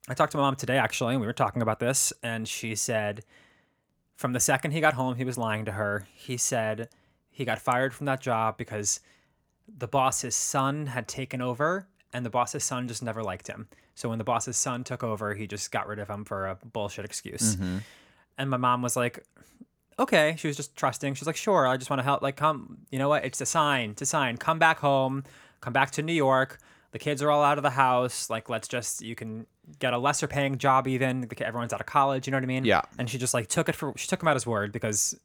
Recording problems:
none

